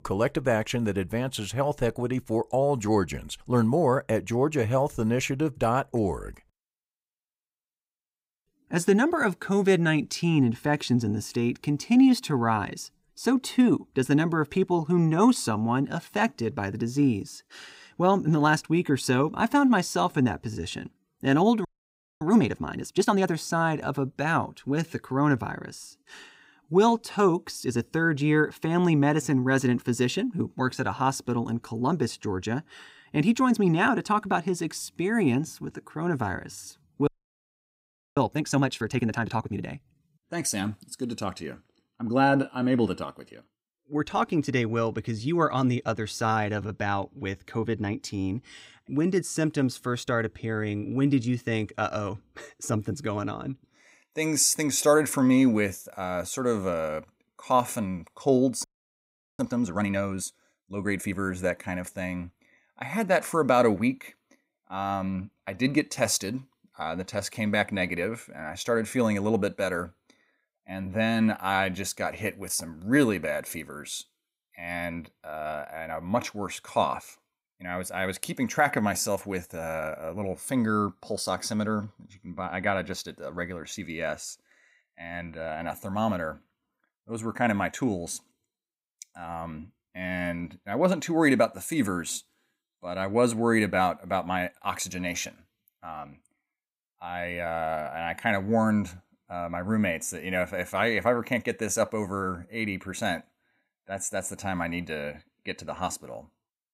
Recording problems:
audio freezing; at 22 s for 0.5 s, at 37 s for 1 s and at 59 s for 1 s

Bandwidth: 15.5 kHz